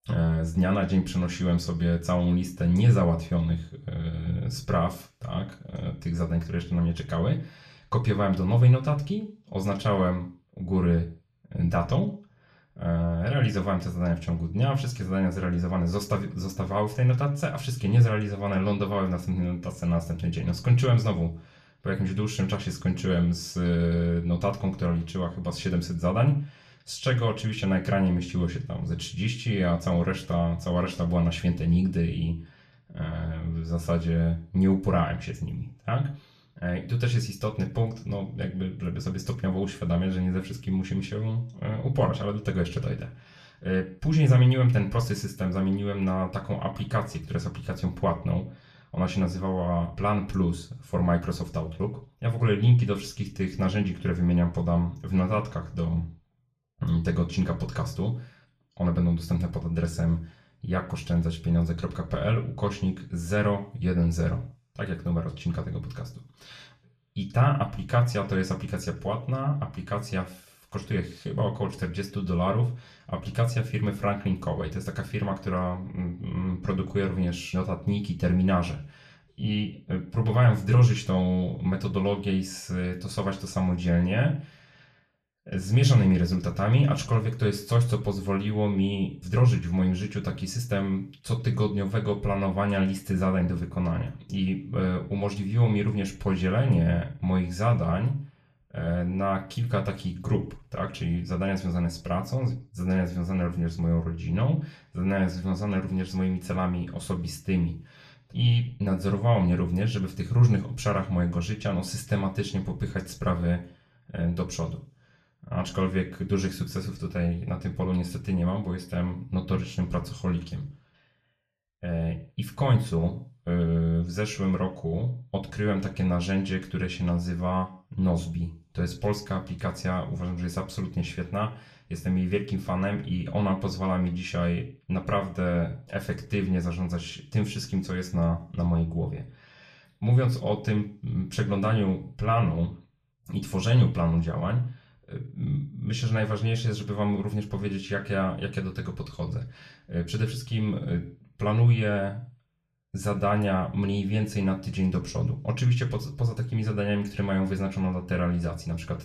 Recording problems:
off-mic speech; far
room echo; very slight; dies away in 0.3 s

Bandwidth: 14 kHz